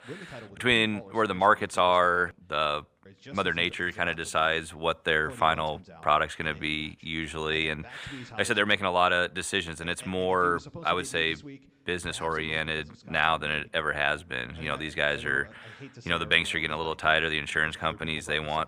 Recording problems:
voice in the background; faint; throughout; 20 dB below the speech

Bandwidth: 15 kHz